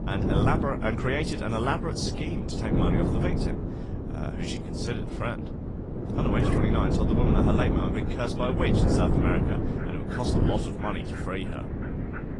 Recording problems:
garbled, watery; slightly
wind noise on the microphone; heavy; 2 dB below the speech
animal sounds; noticeable; throughout; 15 dB below the speech

